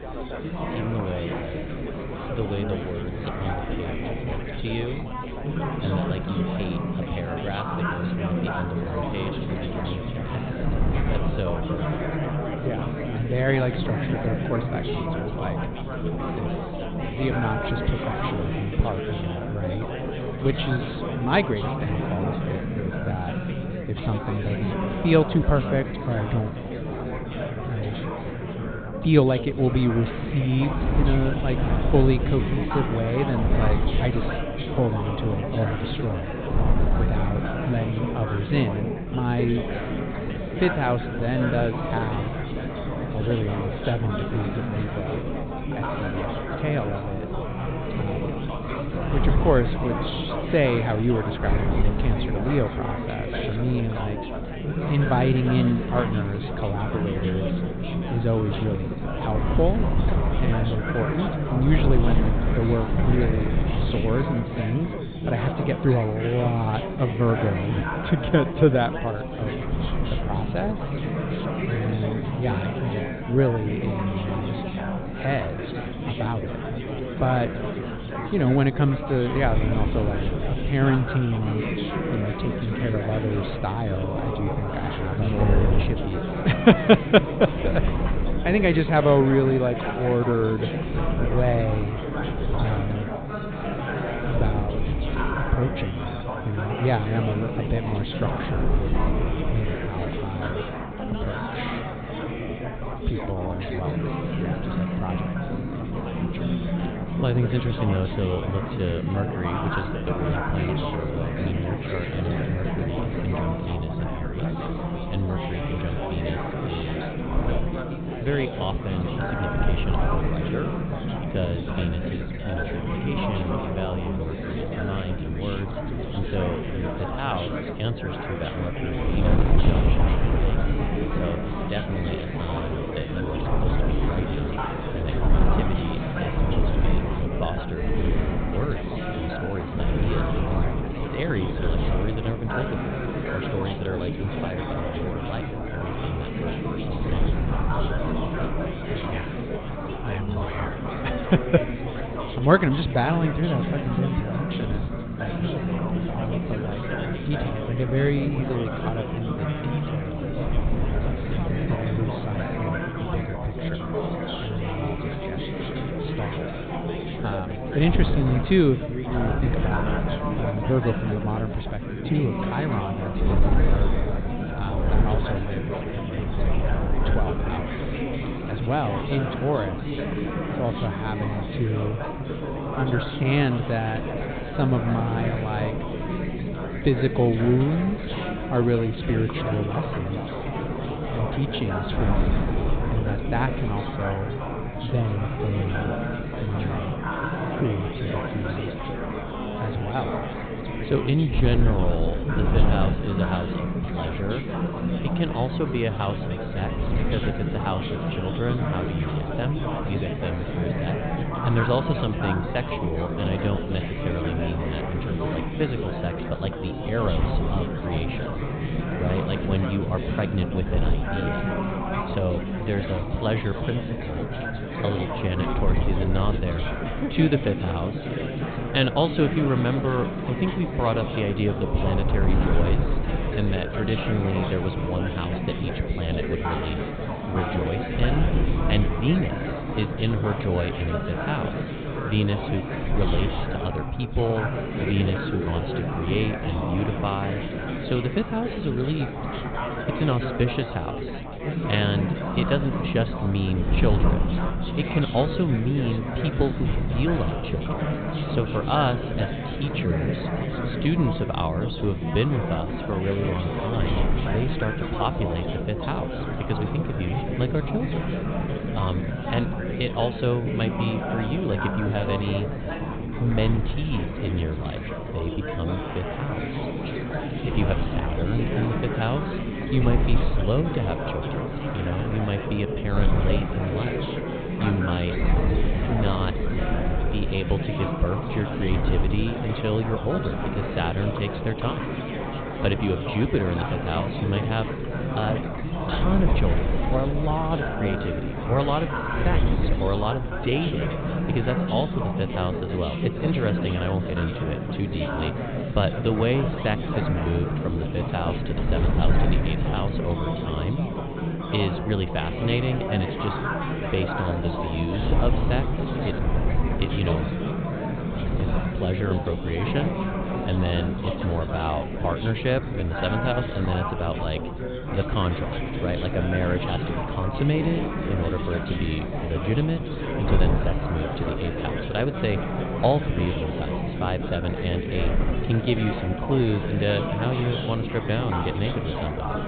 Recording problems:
high frequencies cut off; severe; nothing above 4 kHz
chatter from many people; loud; throughout; 2 dB below the speech
wind noise on the microphone; occasional gusts; 10 dB below the speech

